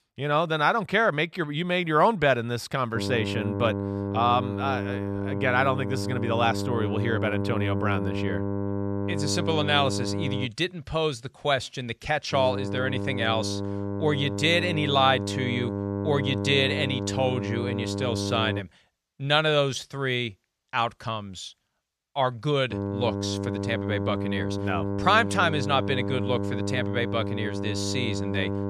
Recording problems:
electrical hum; loud; from 3 to 10 s, from 12 to 19 s and from 23 s on; 50 Hz, 8 dB below the speech

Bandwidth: 14 kHz